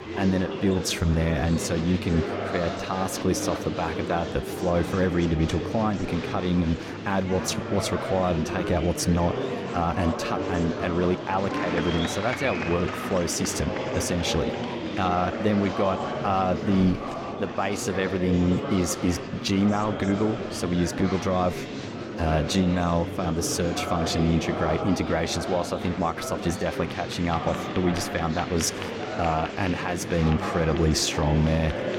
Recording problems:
murmuring crowd; loud; throughout; 5 dB below the speech

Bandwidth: 17.5 kHz